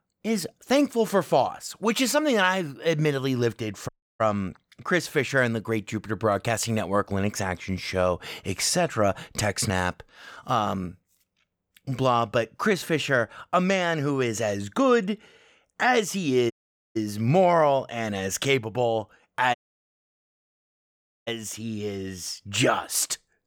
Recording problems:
audio cutting out; at 4 s, at 17 s and at 20 s for 1.5 s

